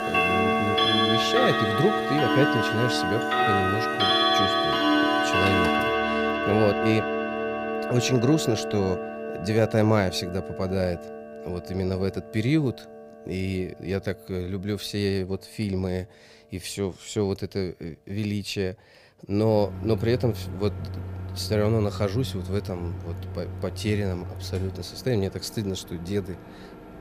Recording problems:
household noises; very loud; throughout; 2 dB above the speech

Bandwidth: 15 kHz